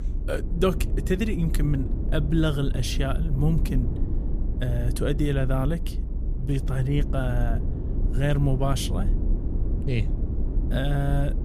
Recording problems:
low rumble; noticeable; throughout; 10 dB below the speech

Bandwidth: 15 kHz